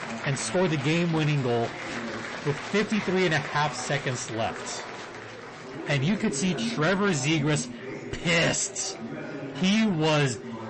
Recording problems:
distortion; heavy; 8 dB below the speech
garbled, watery; slightly; nothing above 8 kHz
murmuring crowd; loud; throughout; 10 dB below the speech

